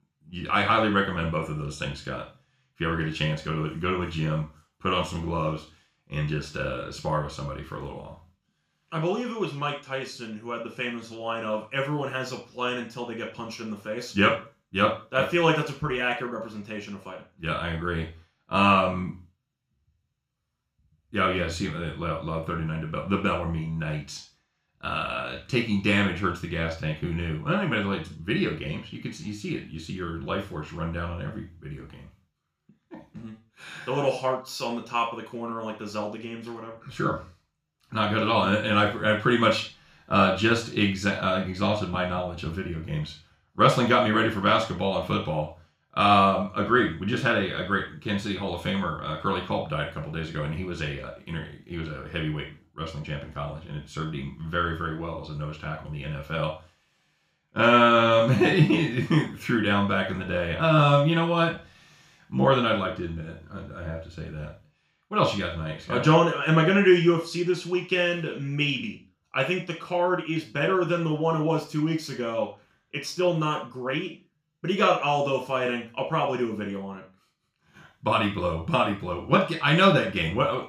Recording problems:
off-mic speech; far
room echo; slight; dies away in 0.3 s

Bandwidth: 15 kHz